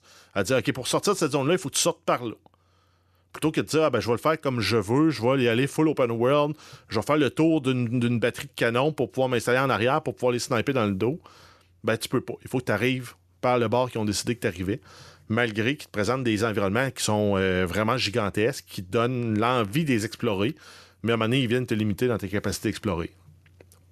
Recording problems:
none

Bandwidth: 13.5 kHz